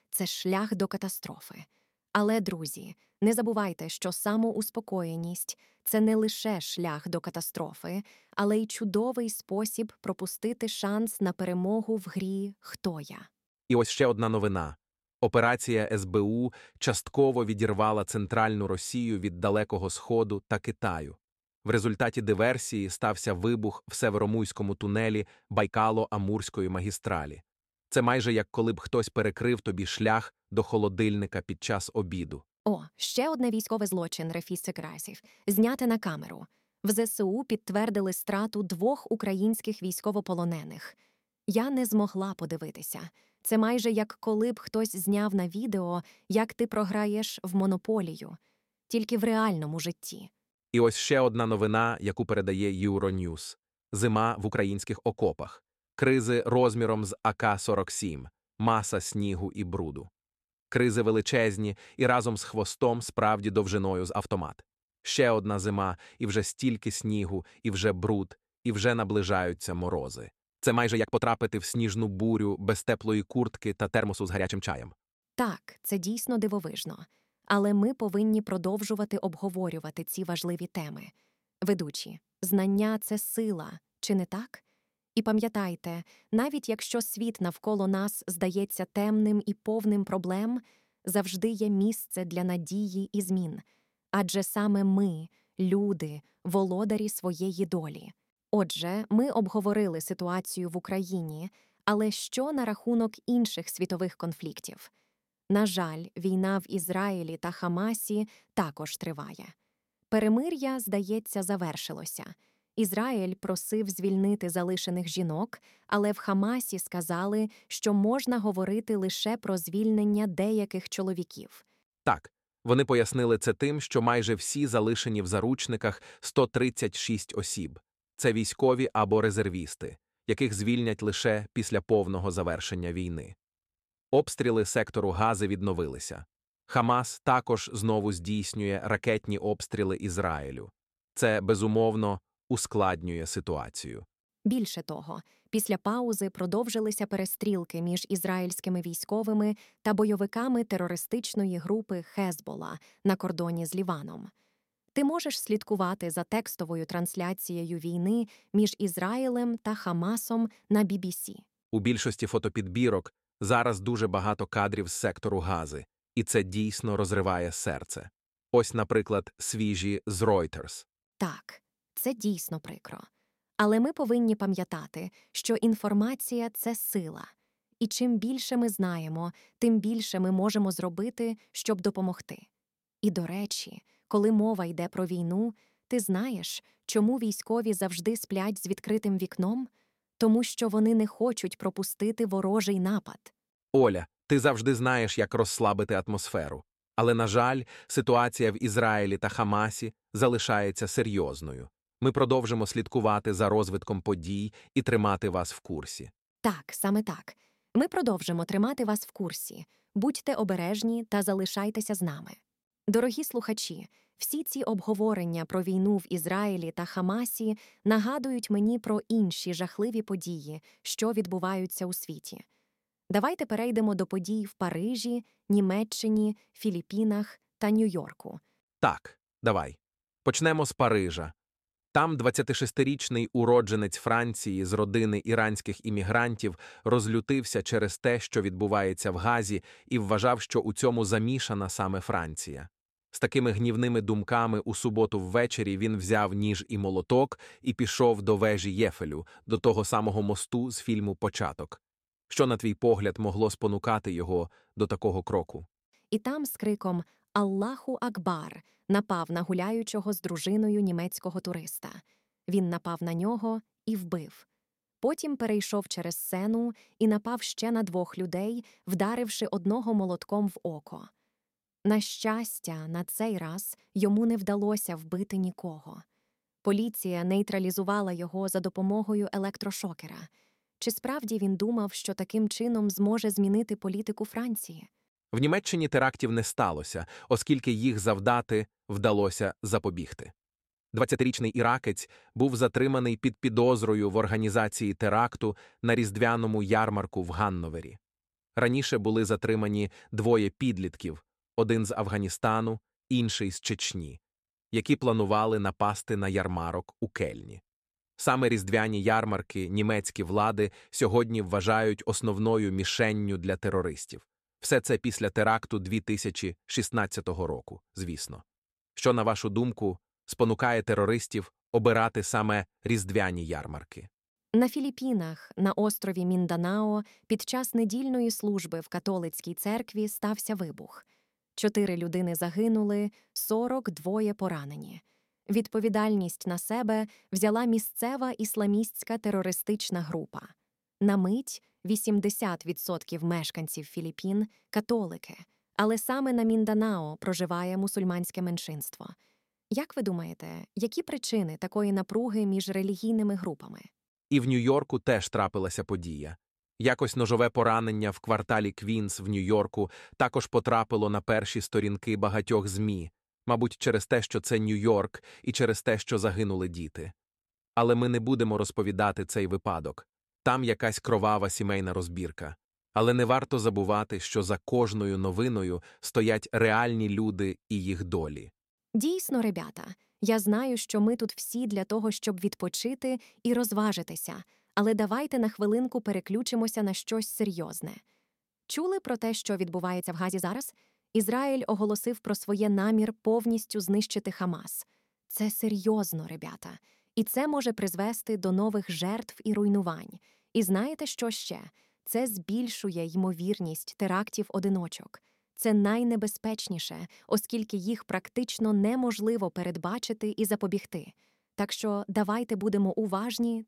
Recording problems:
uneven, jittery; strongly; from 3 s to 6:31

